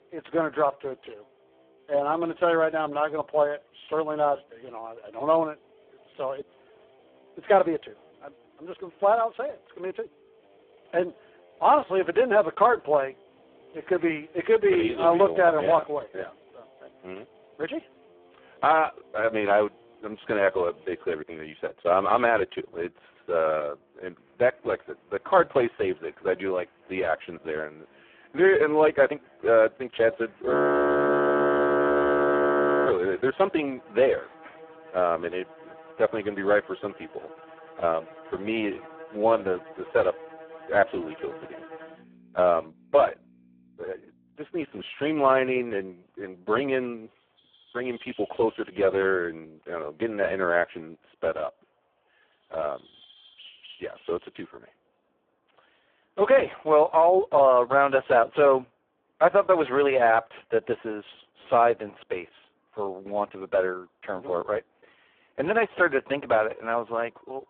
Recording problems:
phone-call audio; poor line
background music; faint; throughout; 25 dB below the speech
animal sounds; faint; from 24 s on; 25 dB below the speech
audio freezing; at 31 s for 2.5 s

